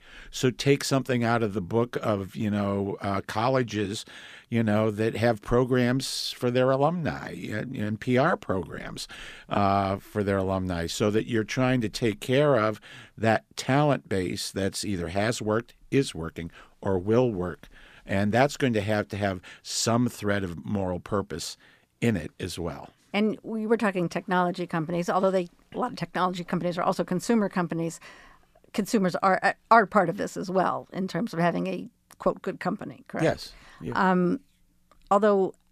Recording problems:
none

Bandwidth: 14.5 kHz